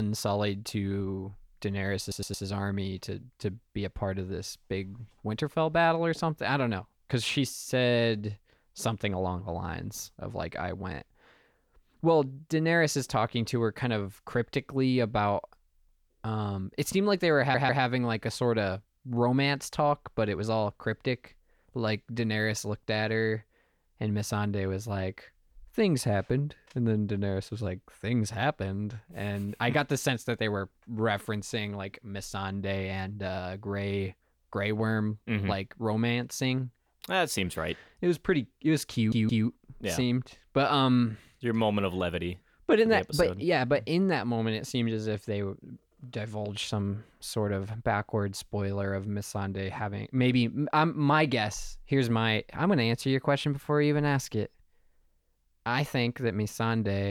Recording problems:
abrupt cut into speech; at the start and the end
audio stuttering; at 2 s, at 17 s and at 39 s

